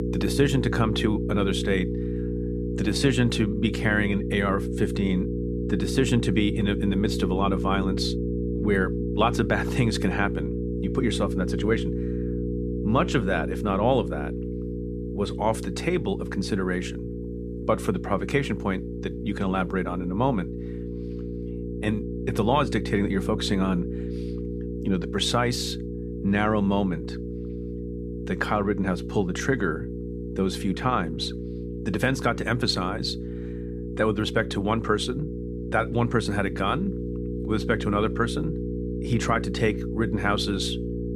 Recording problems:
electrical hum; loud; throughout; 60 Hz, 8 dB below the speech

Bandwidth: 14.5 kHz